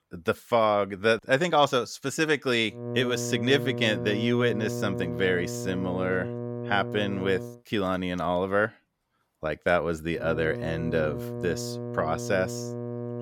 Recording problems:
electrical hum; noticeable; from 3 to 7.5 s and from 10 s on; 60 Hz, 10 dB below the speech

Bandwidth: 17 kHz